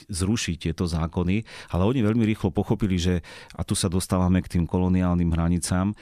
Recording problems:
none

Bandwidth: 14.5 kHz